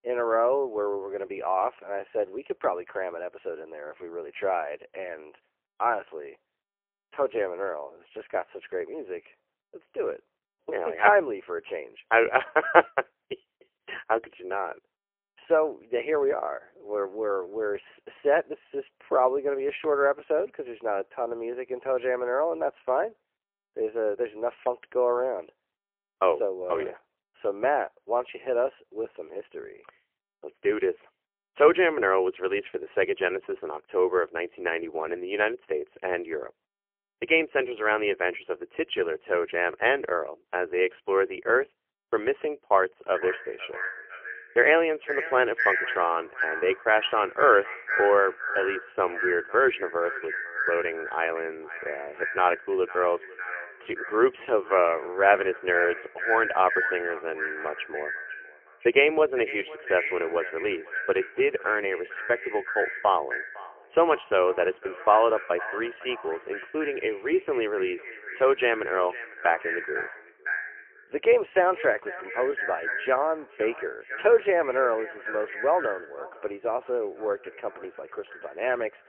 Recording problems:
phone-call audio; poor line; nothing above 3 kHz
echo of what is said; strong; from 43 s on; 500 ms later, 7 dB below the speech

